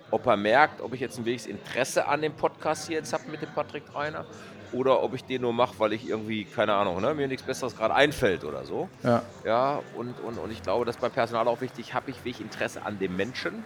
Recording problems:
chatter from many people; noticeable; throughout; 20 dB below the speech

